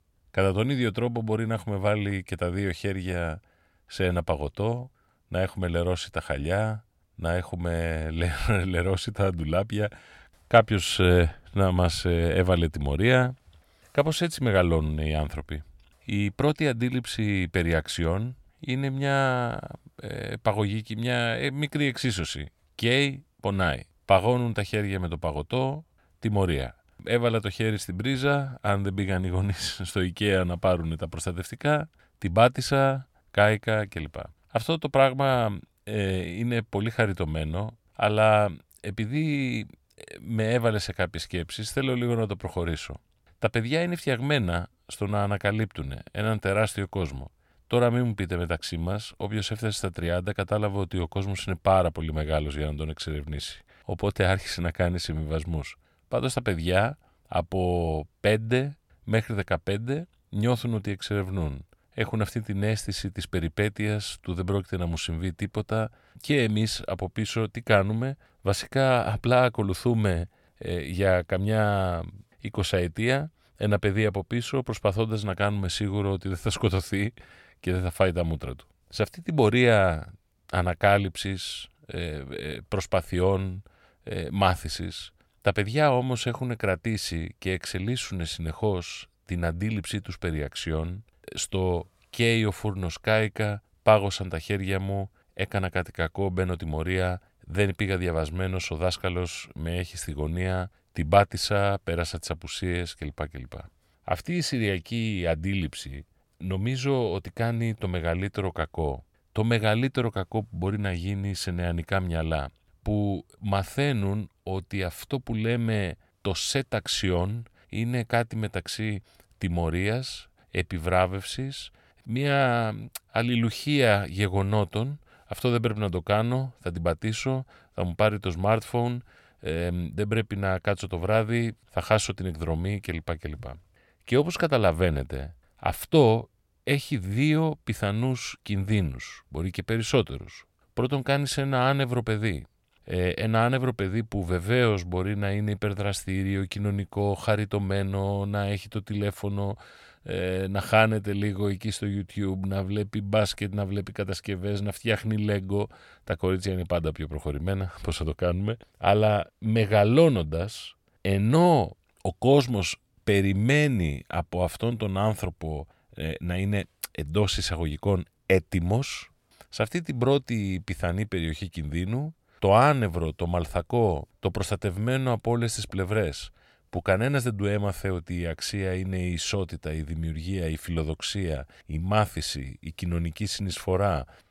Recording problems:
none

